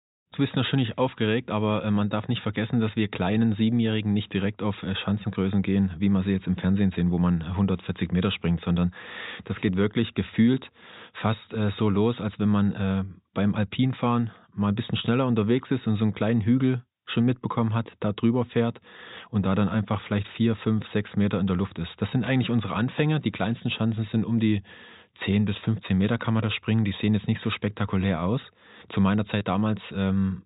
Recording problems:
high frequencies cut off; severe; nothing above 4 kHz

